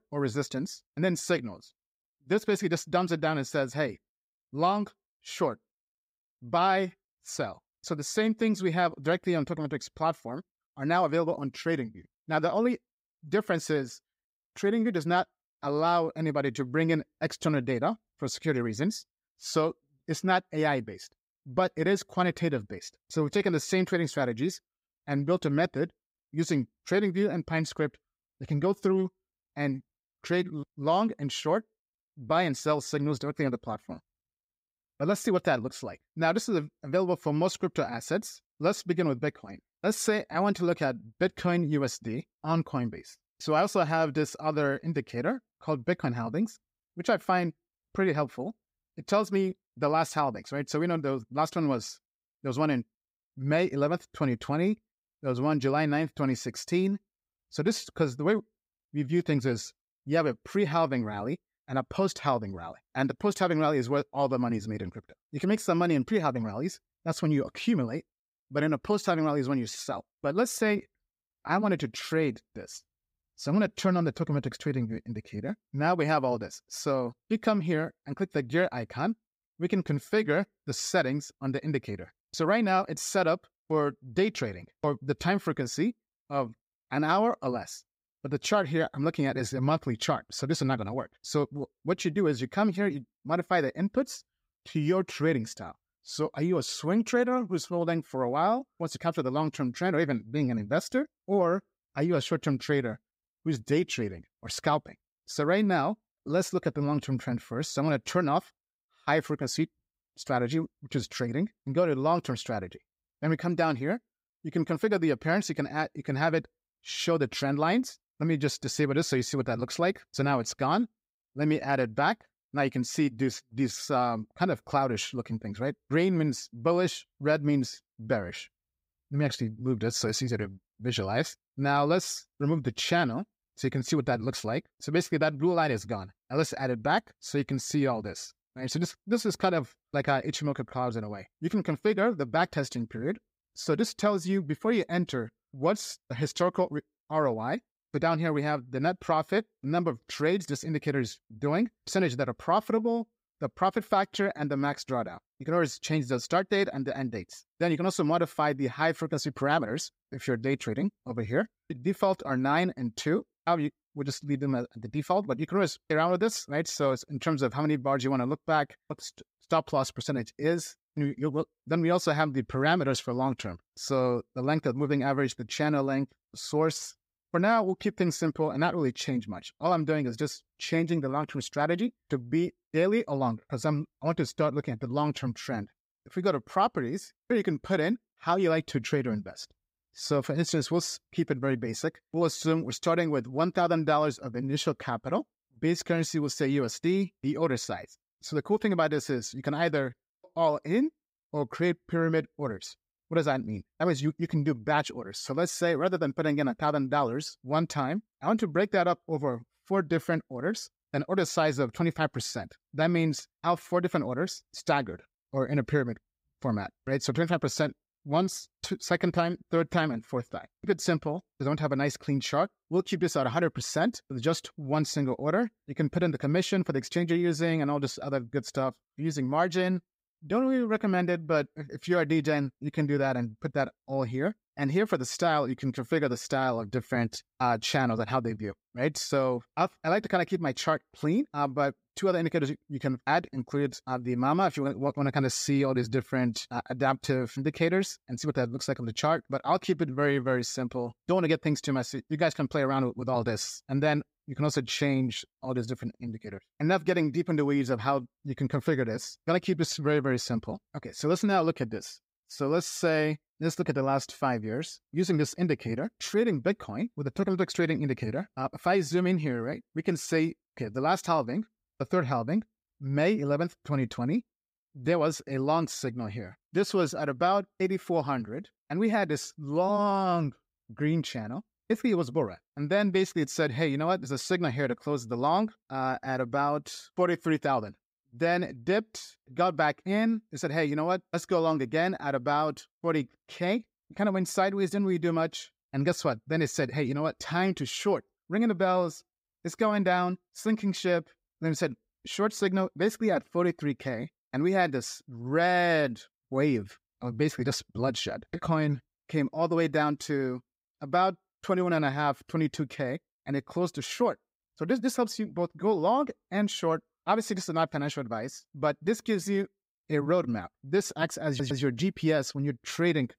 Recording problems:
audio stuttering; at 5:21

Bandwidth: 15.5 kHz